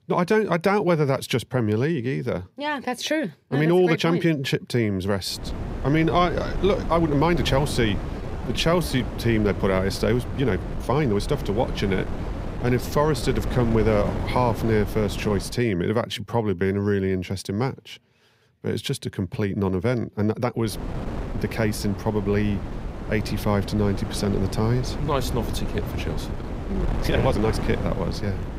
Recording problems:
wind noise on the microphone; occasional gusts; from 5.5 to 16 s and from 21 s on; 10 dB below the speech
uneven, jittery; strongly; from 3.5 to 28 s

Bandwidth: 15.5 kHz